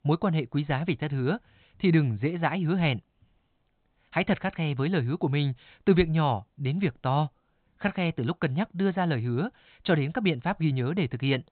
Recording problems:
high frequencies cut off; severe; nothing above 4 kHz

